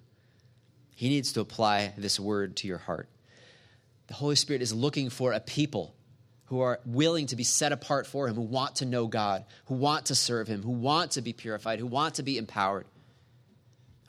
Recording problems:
none

